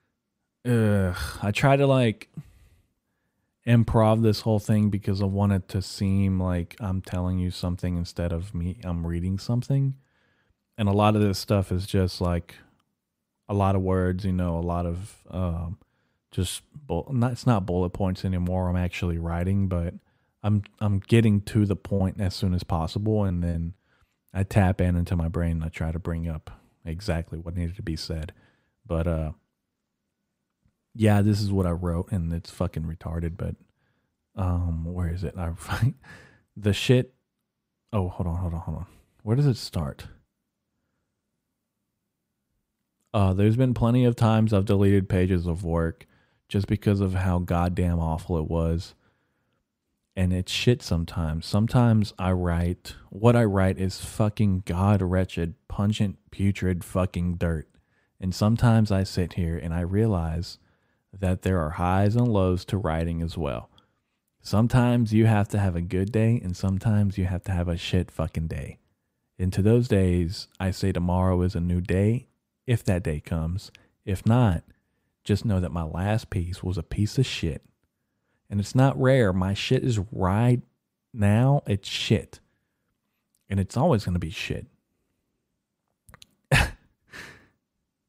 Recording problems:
choppy; very; from 22 to 24 s; 5% of the speech affected

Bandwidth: 15.5 kHz